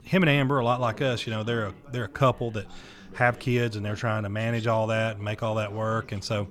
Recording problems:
background chatter; faint; throughout; 3 voices, 20 dB below the speech

